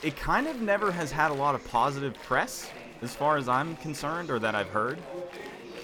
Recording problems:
chatter from many people; noticeable; throughout; 15 dB below the speech

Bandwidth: 18.5 kHz